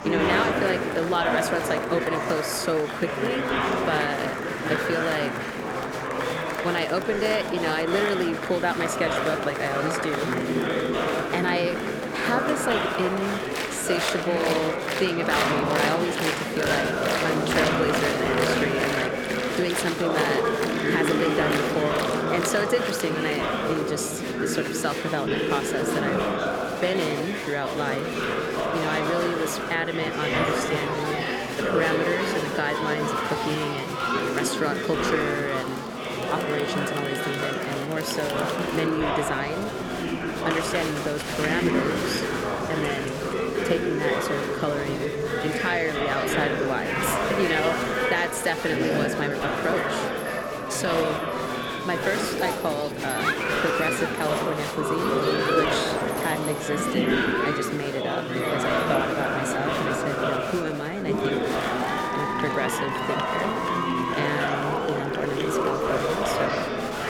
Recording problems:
murmuring crowd; very loud; throughout; 3 dB above the speech

